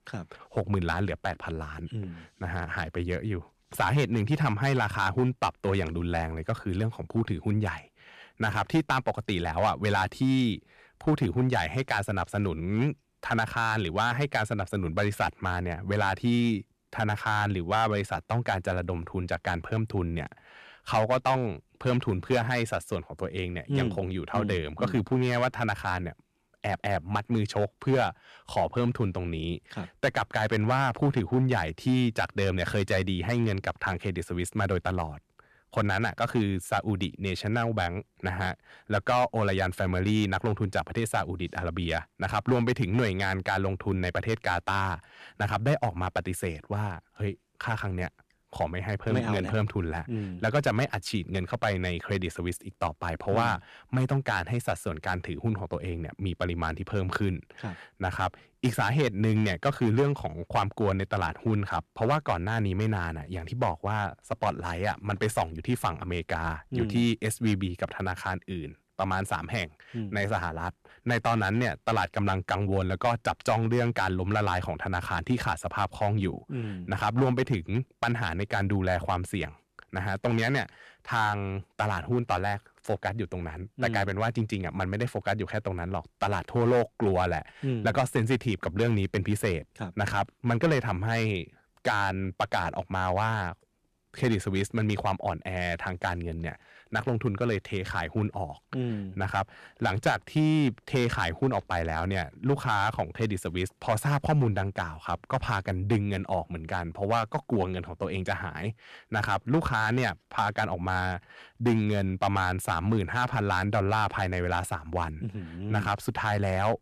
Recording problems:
distortion; slight; 3% of the sound clipped

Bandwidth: 13.5 kHz